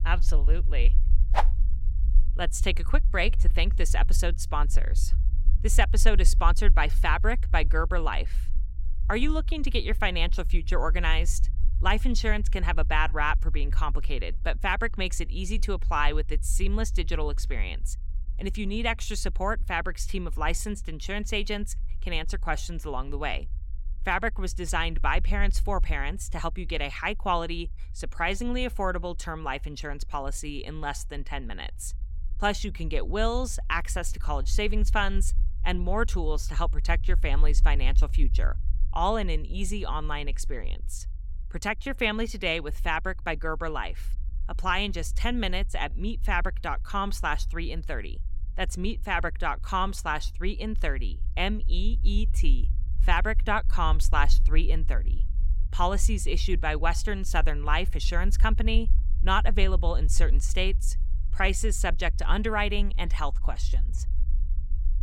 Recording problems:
low rumble; faint; throughout; 25 dB below the speech

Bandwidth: 17 kHz